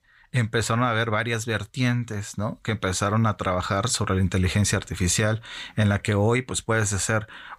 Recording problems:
none

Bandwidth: 15.5 kHz